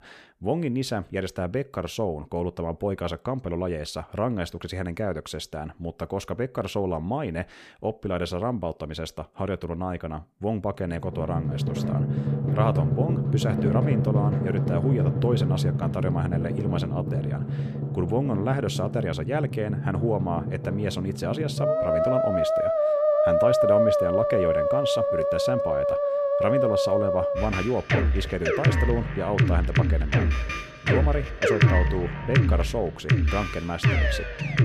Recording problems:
background music; very loud; from 11 s on; 5 dB above the speech

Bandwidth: 14.5 kHz